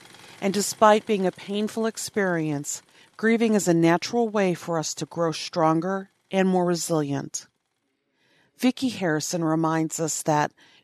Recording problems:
machinery noise; faint; throughout; 30 dB below the speech

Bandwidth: 13.5 kHz